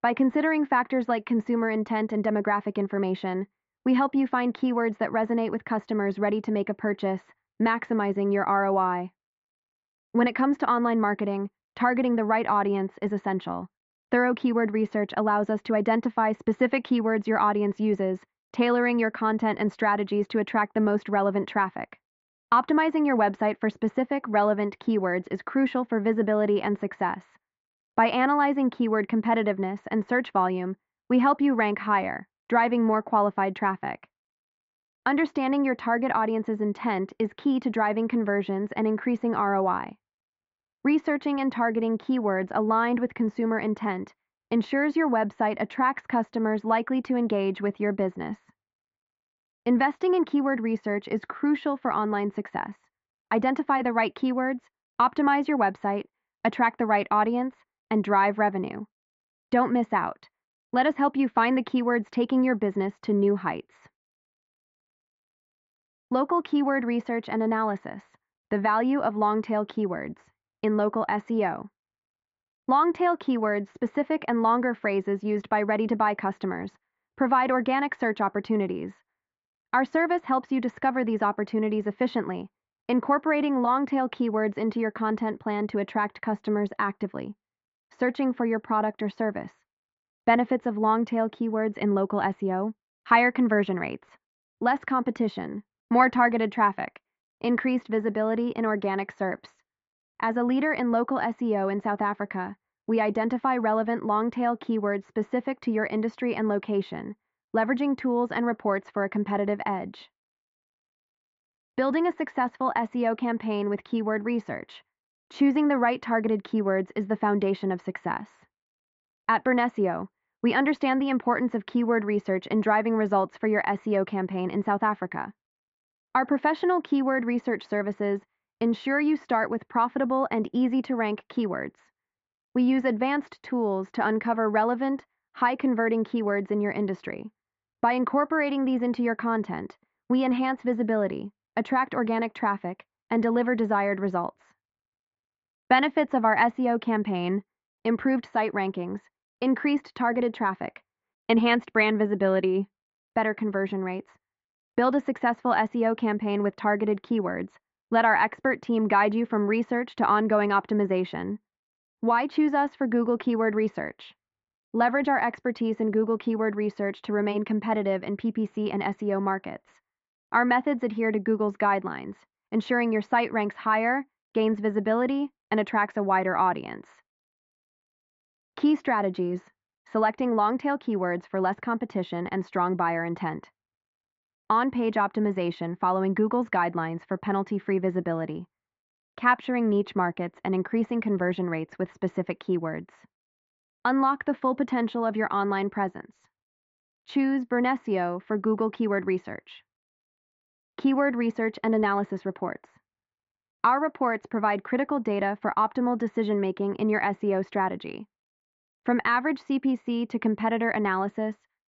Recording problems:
muffled; very slightly; fading above 2 kHz
high frequencies cut off; slight; nothing above 8 kHz

